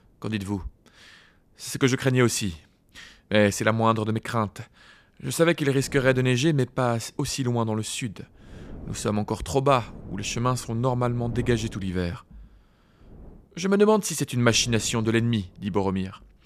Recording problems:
wind noise on the microphone; occasional gusts; 25 dB below the speech

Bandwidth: 14.5 kHz